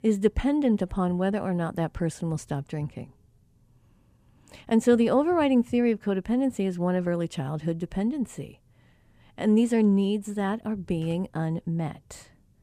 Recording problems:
none

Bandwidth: 15 kHz